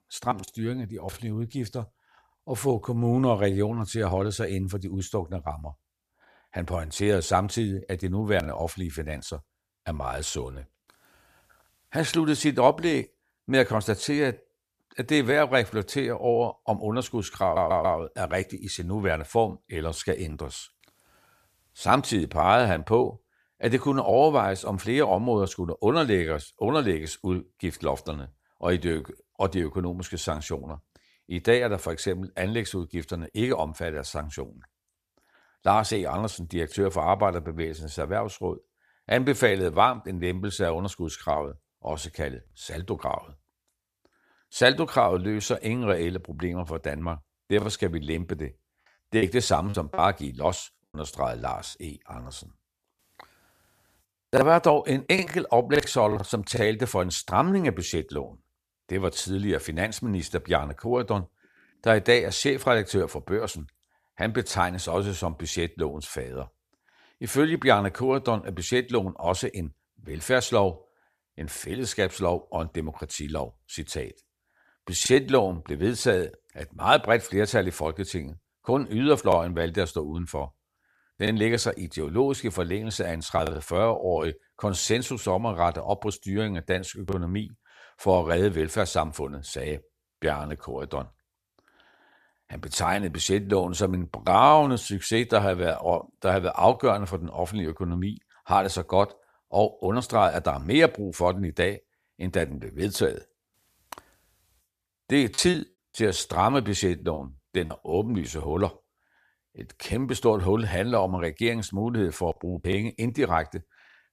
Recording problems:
audio stuttering; at 17 s
choppy; very; from 49 to 52 s and from 1:45 to 1:48; 7% of the speech affected

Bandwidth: 14.5 kHz